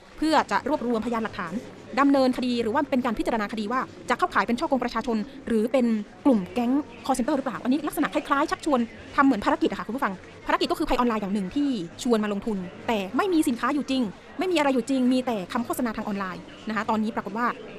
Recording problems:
wrong speed, natural pitch; too fast; 1.6 times normal speed
murmuring crowd; noticeable; throughout; 20 dB below the speech

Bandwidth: 14 kHz